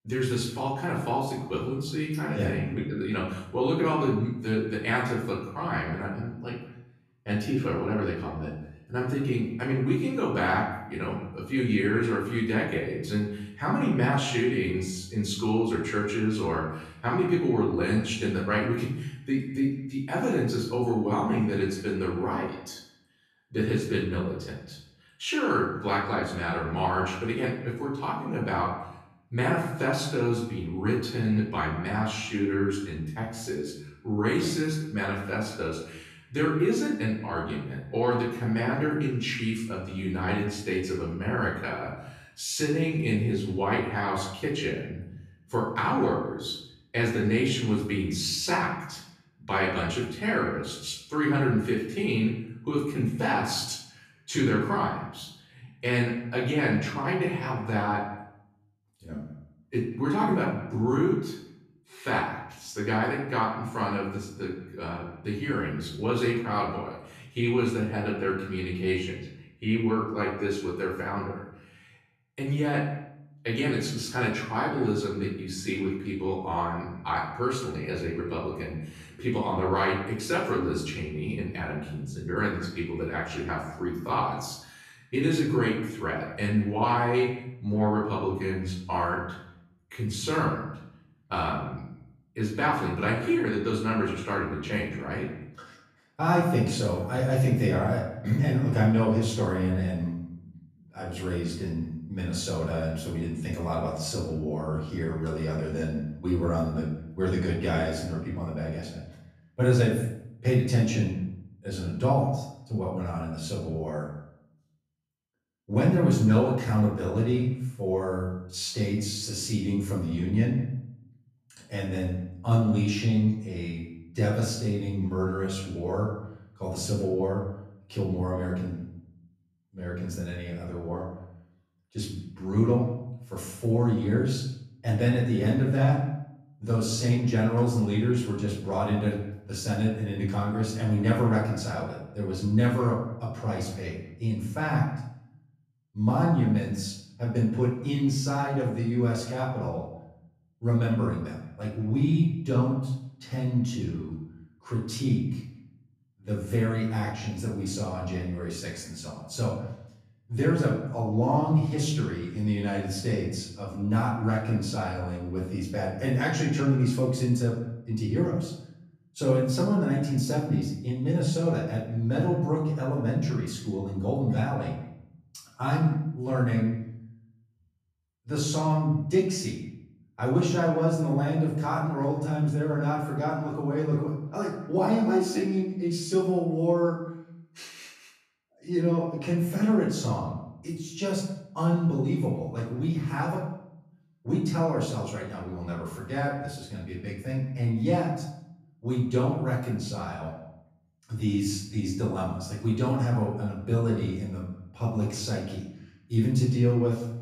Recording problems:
off-mic speech; far
room echo; noticeable; dies away in 0.7 s
echo of what is said; faint; throughout; 170 ms later, 20 dB below the speech

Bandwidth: 14.5 kHz